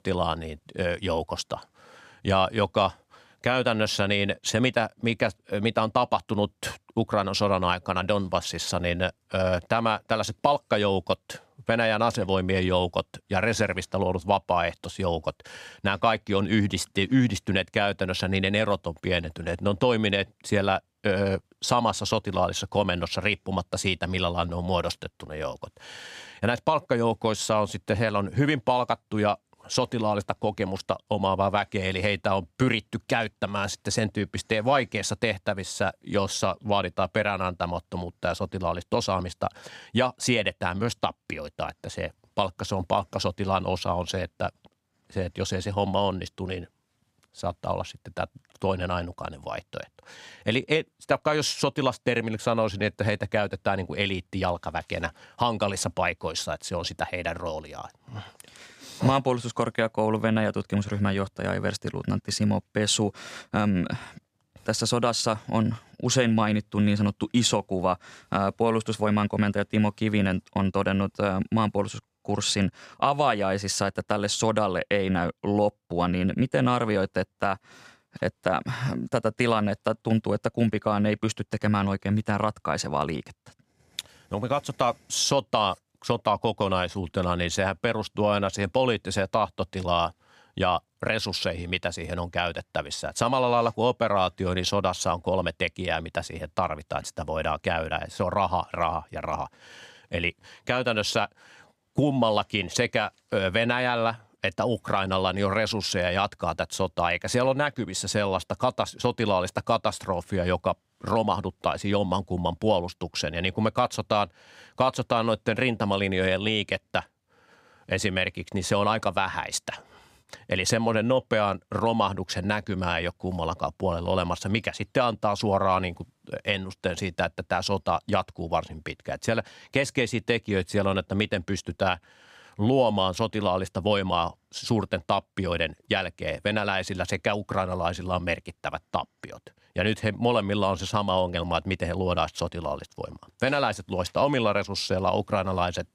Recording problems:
none

